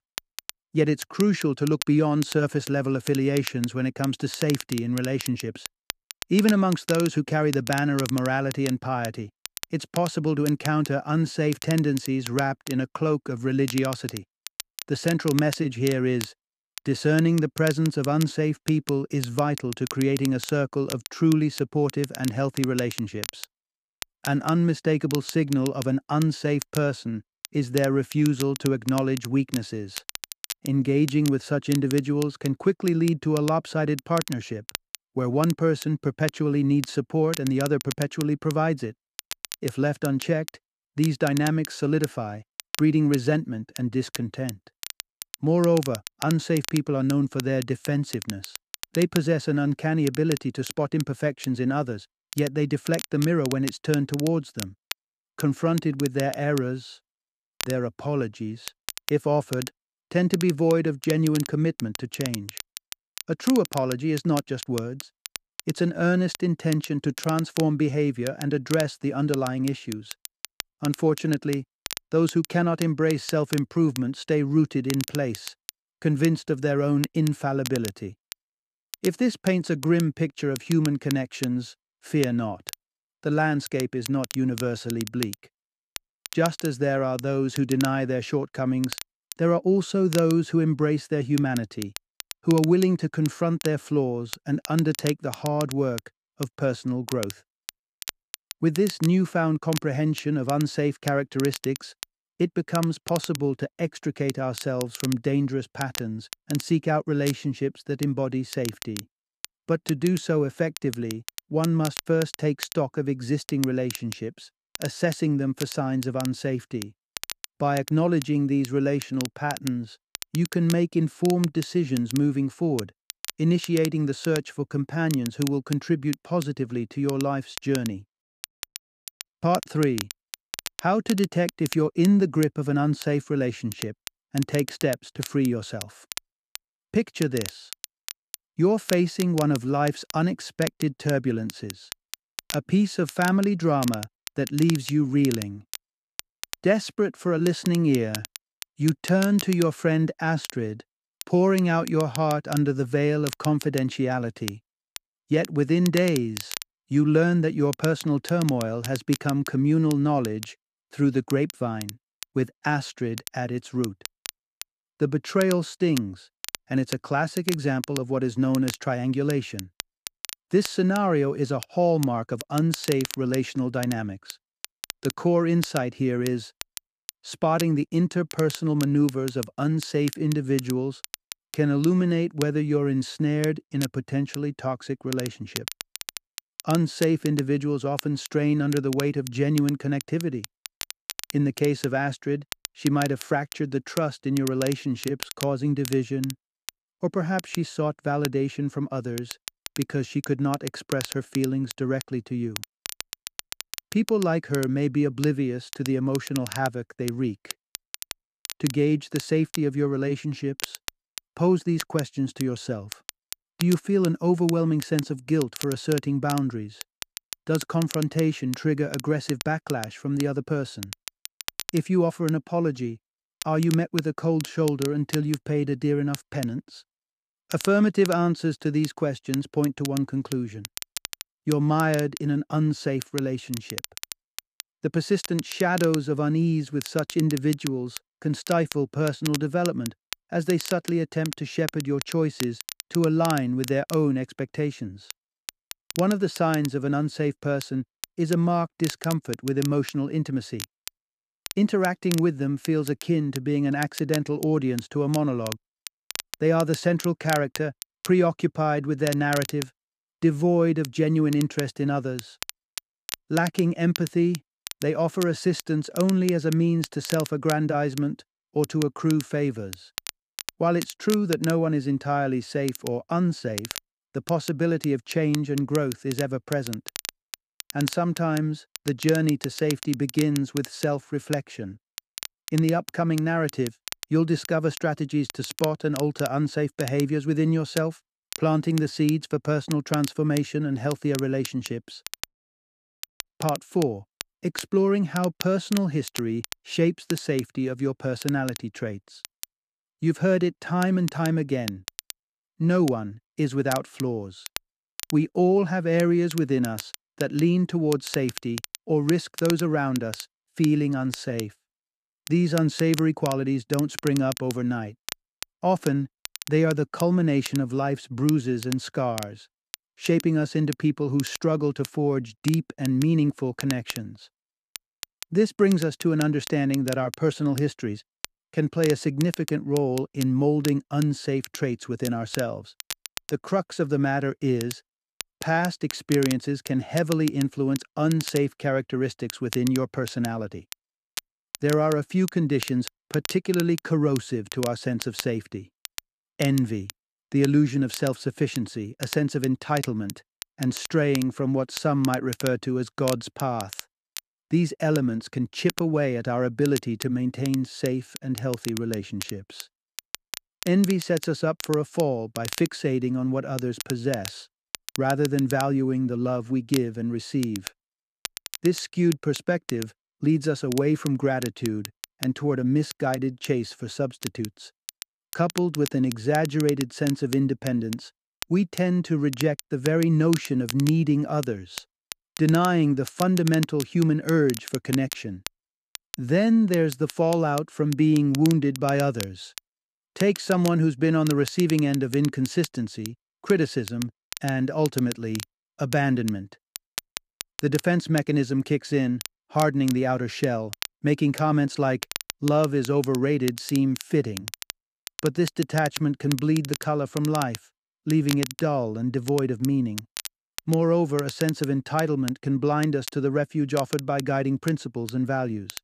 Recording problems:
crackle, like an old record; noticeable; 15 dB below the speech

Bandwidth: 14.5 kHz